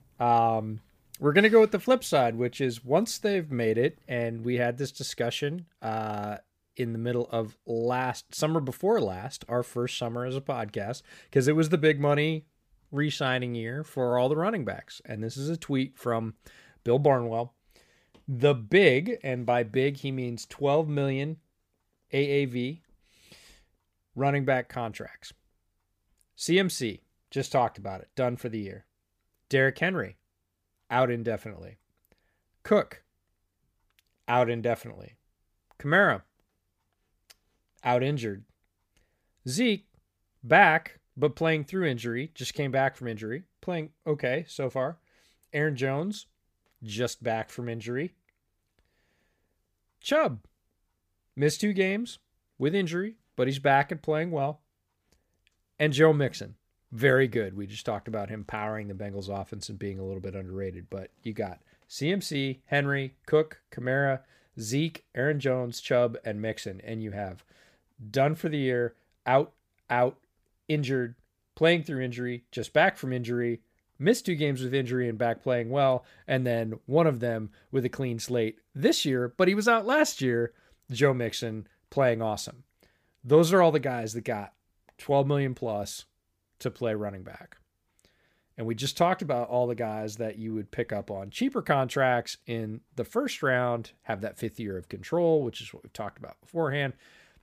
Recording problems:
none

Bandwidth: 15 kHz